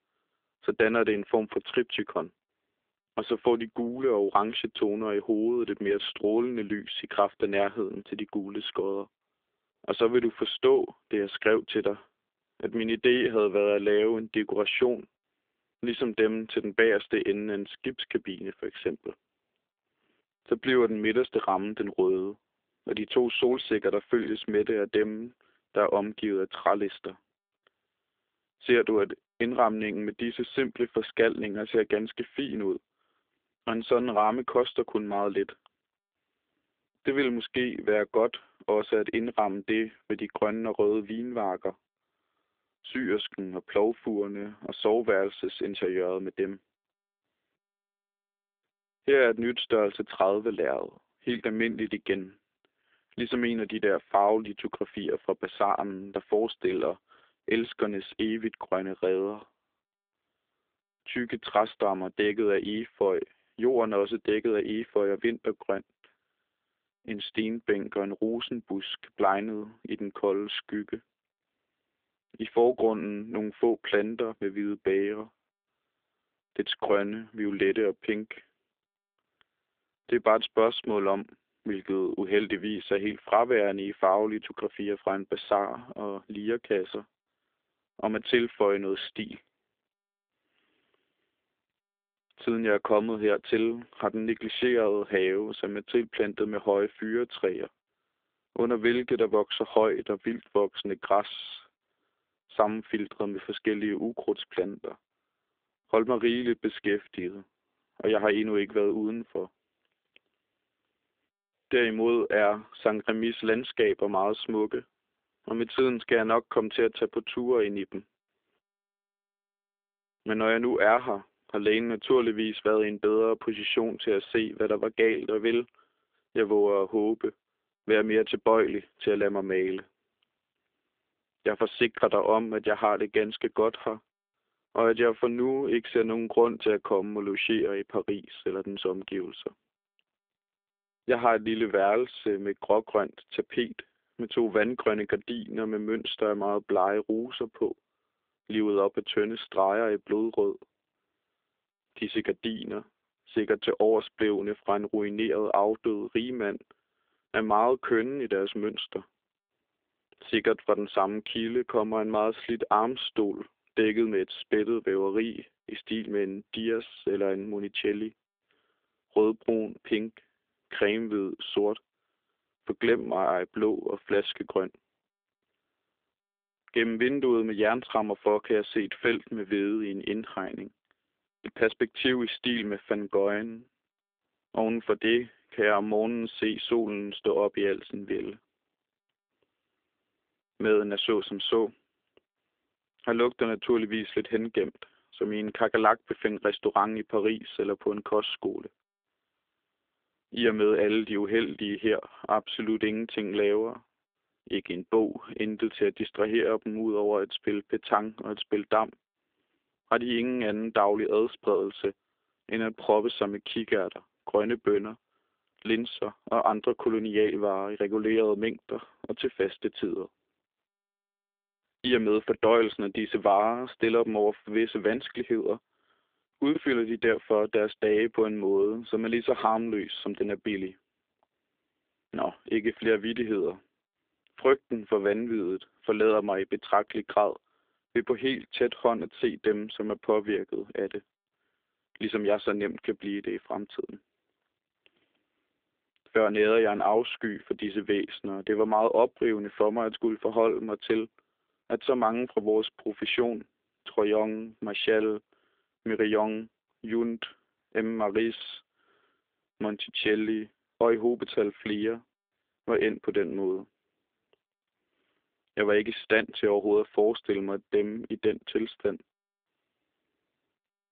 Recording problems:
phone-call audio; nothing above 3.5 kHz

